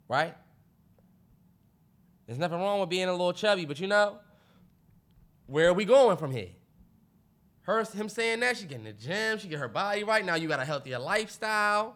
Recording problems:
none

